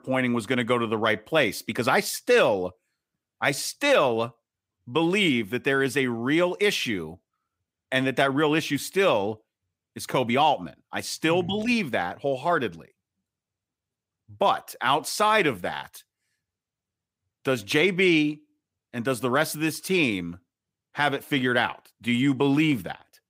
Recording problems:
none

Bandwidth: 15.5 kHz